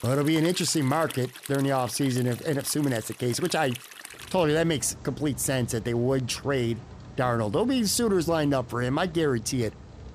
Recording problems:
rain or running water; noticeable; throughout; 15 dB below the speech

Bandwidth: 15 kHz